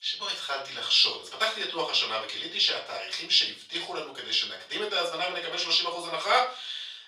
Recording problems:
off-mic speech; far
thin; very; fading below 650 Hz
room echo; slight; dies away in 0.3 s

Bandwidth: 15 kHz